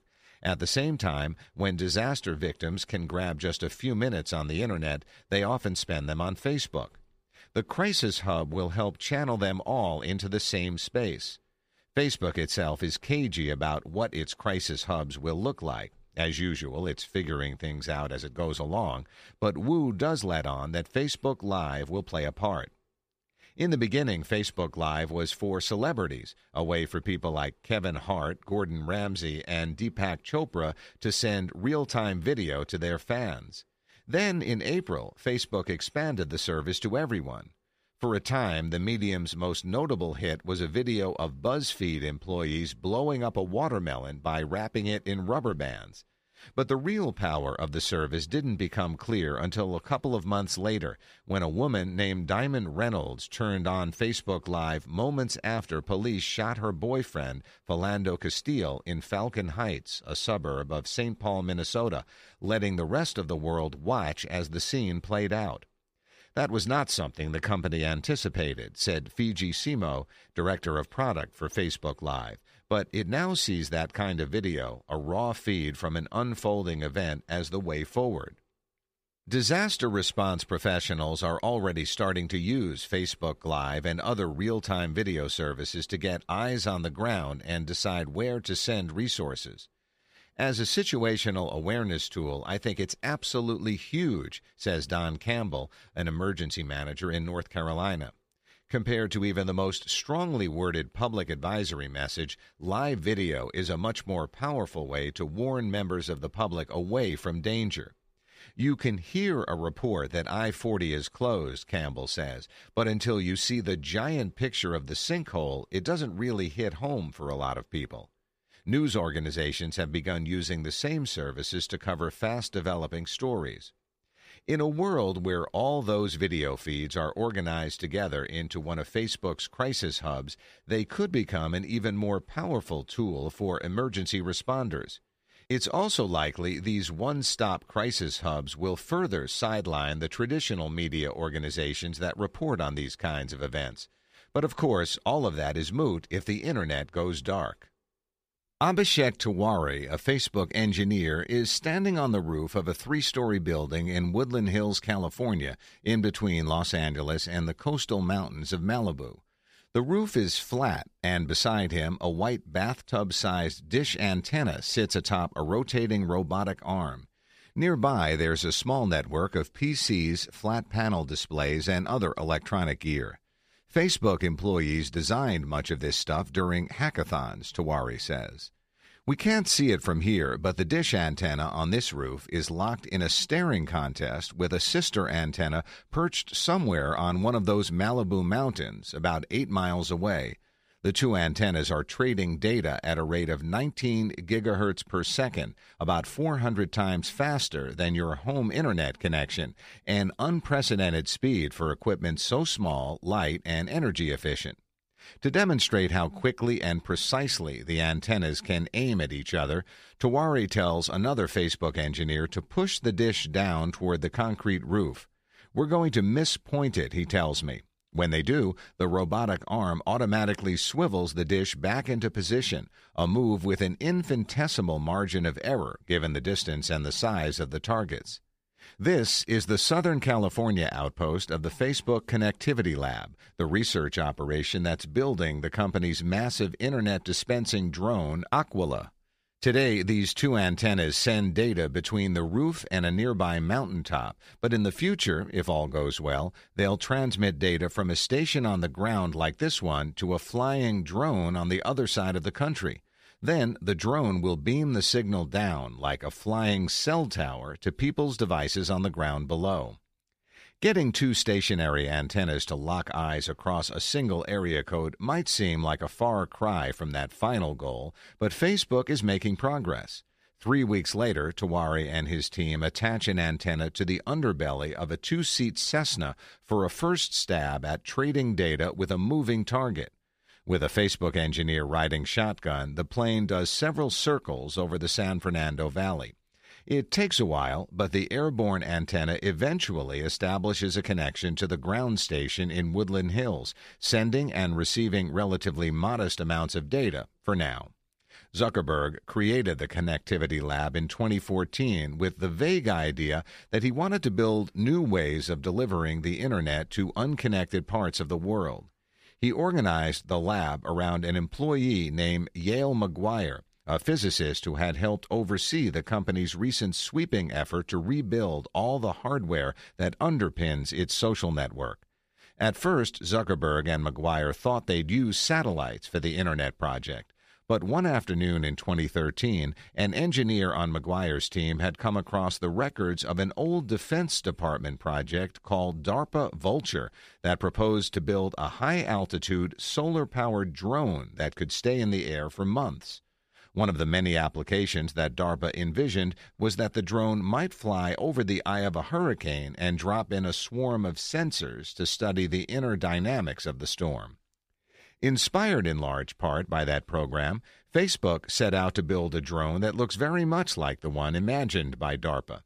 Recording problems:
none

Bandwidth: 15 kHz